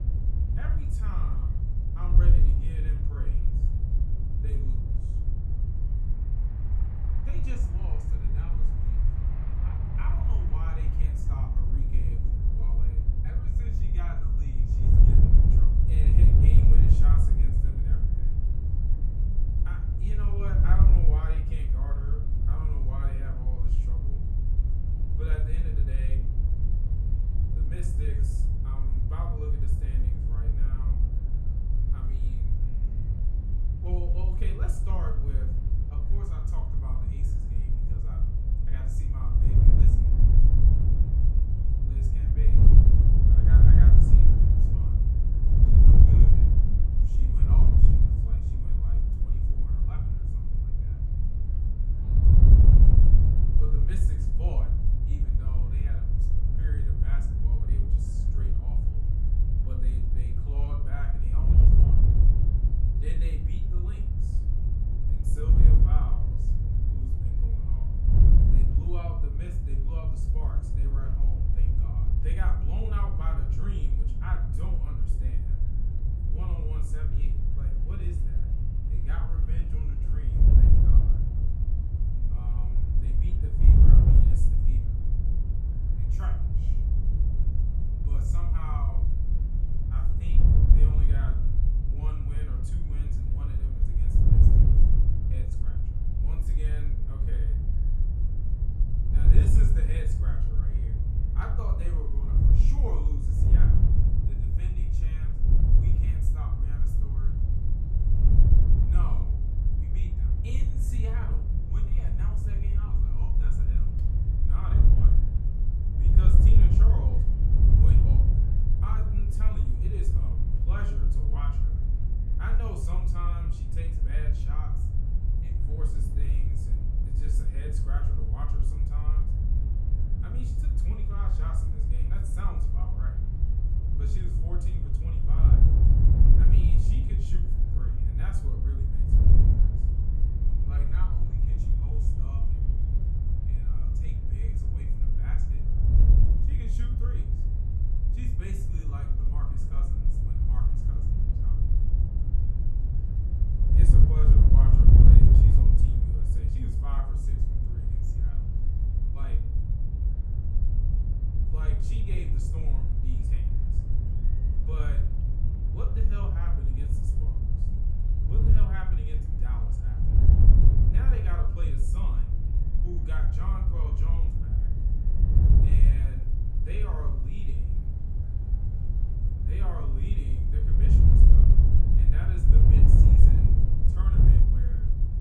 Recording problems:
off-mic speech; far
room echo; slight; dies away in 0.4 s
wind noise on the microphone; heavy; 4 dB above the speech
train or aircraft noise; faint; throughout; 25 dB below the speech
murmuring crowd; faint; throughout; 25 dB below the speech

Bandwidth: 13.5 kHz